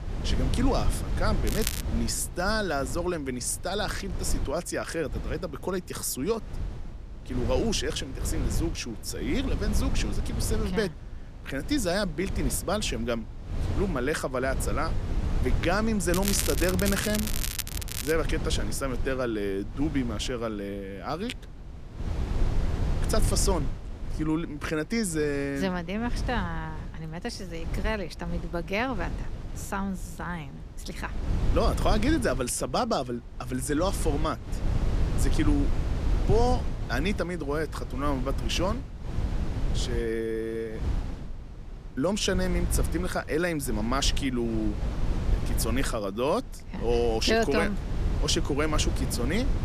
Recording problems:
crackling; loud; at 1.5 s and from 16 to 18 s; 3 dB below the speech
wind noise on the microphone; occasional gusts; 10 dB below the speech

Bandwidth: 14.5 kHz